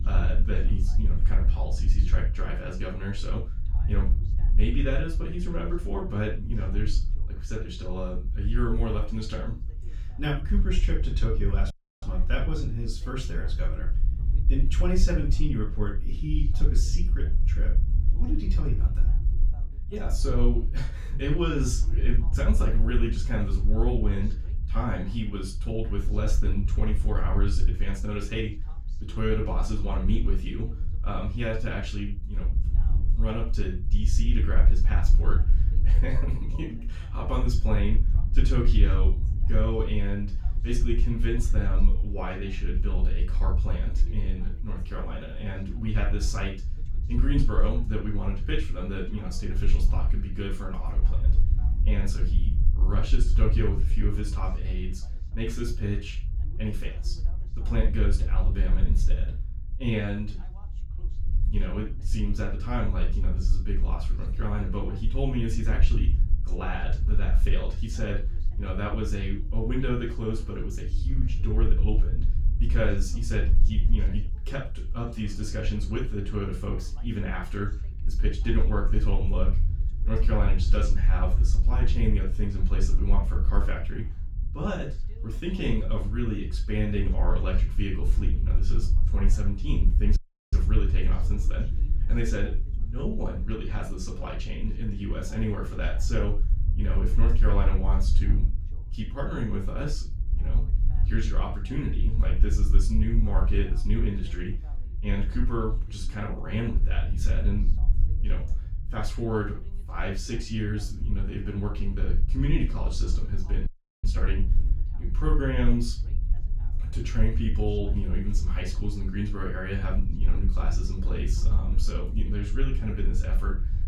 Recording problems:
off-mic speech; far
room echo; noticeable; dies away in 0.2 s
low rumble; noticeable; throughout; 15 dB below the speech
voice in the background; faint; throughout; 25 dB below the speech
audio cutting out; at 12 s, at 1:30 and at 1:54

